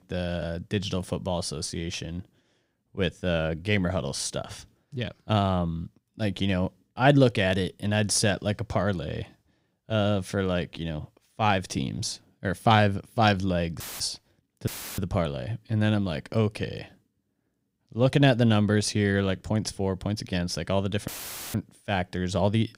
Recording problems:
audio cutting out; filled with static; at 14 s, at 15 s and at 21 s

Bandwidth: 15.5 kHz